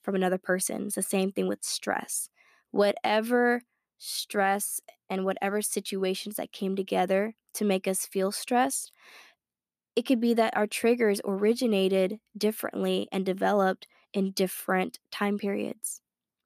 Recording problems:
none

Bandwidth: 14.5 kHz